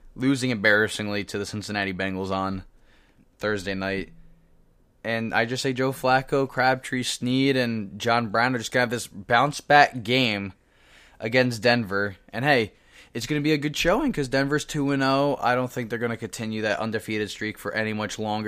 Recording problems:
abrupt cut into speech; at the end

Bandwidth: 15 kHz